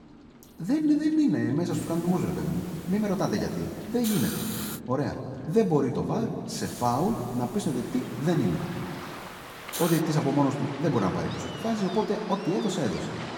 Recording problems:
off-mic speech; far
room echo; noticeable; dies away in 2 s
rain or running water; noticeable; throughout; 15 dB below the speech
hiss; noticeable; from 1.5 to 5 s and from 6.5 to 10 s; 10 dB below the speech

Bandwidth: 17.5 kHz